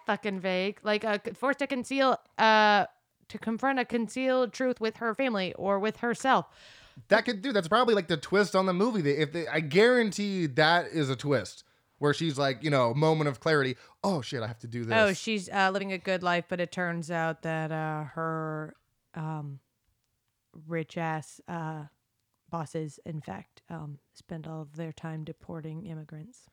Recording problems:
uneven, jittery; strongly; from 1 to 26 s

